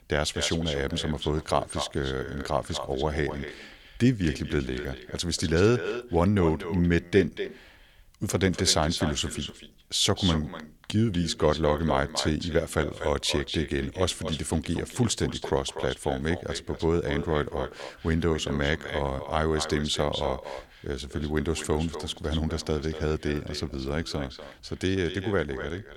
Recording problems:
echo of what is said; strong; throughout; 240 ms later, 10 dB below the speech

